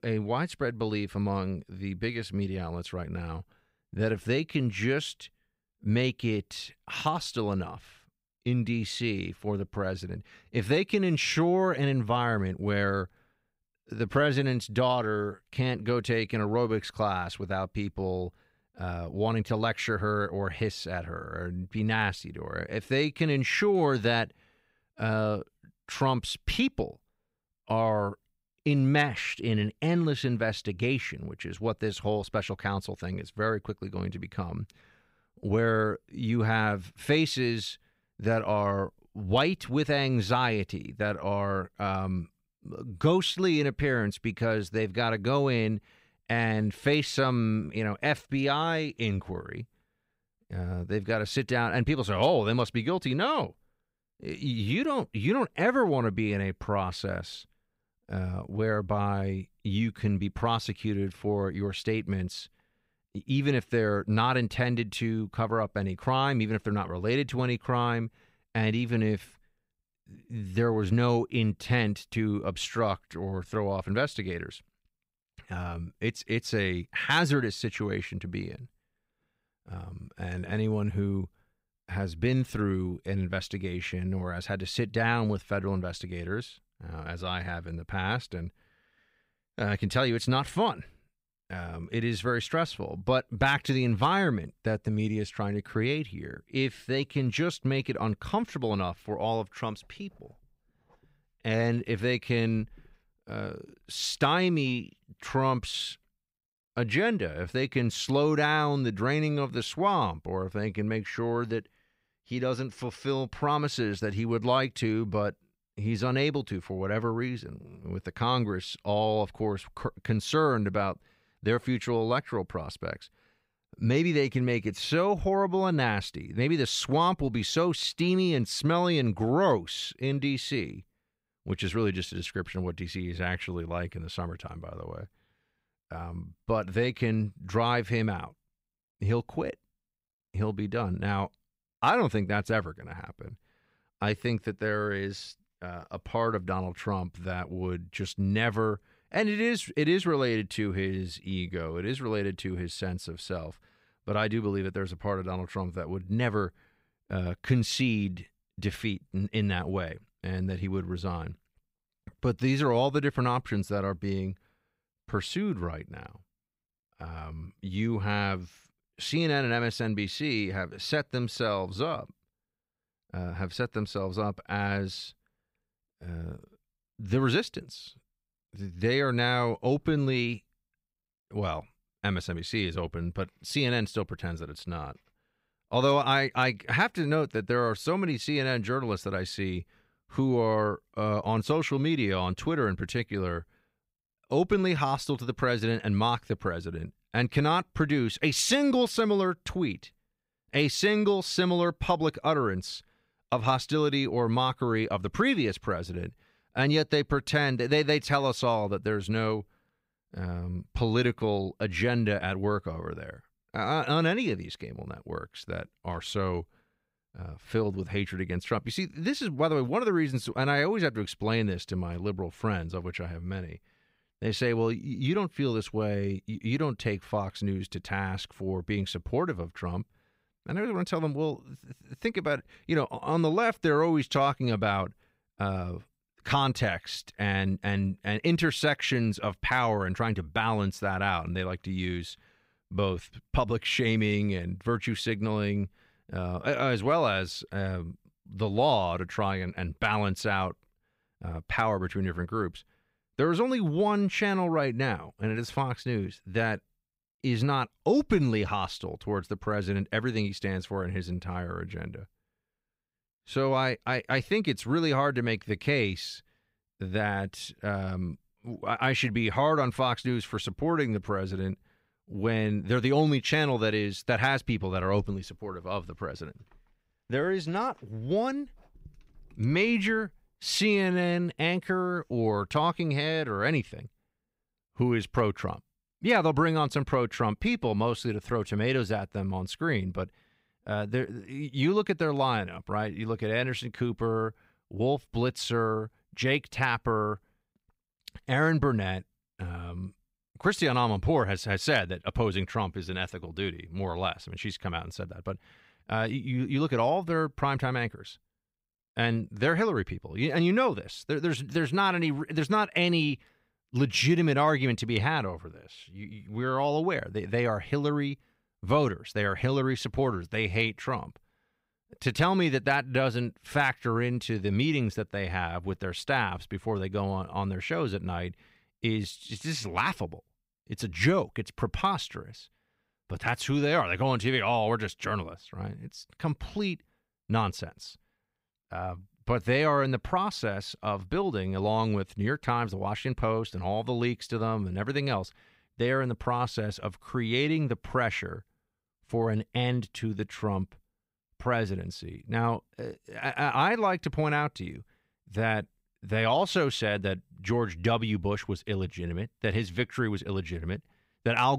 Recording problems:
abrupt cut into speech; at the end

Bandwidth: 15.5 kHz